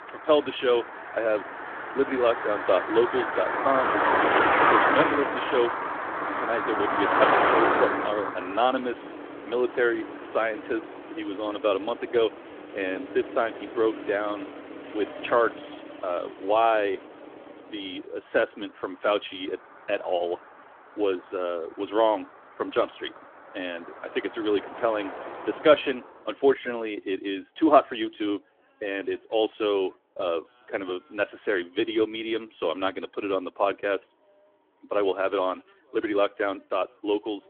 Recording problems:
phone-call audio; nothing above 3.5 kHz
traffic noise; loud; throughout; 1 dB below the speech

